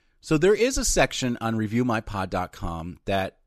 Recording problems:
none

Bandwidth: 13.5 kHz